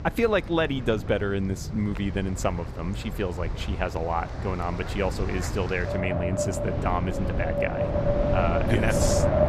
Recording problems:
wind in the background; loud; throughout; 1 dB below the speech

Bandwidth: 14.5 kHz